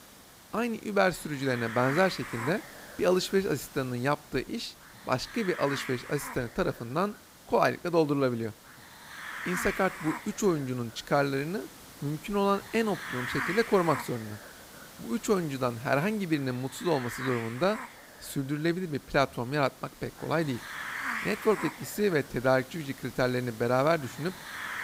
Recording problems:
hiss; noticeable; throughout; 10 dB below the speech

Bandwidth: 15.5 kHz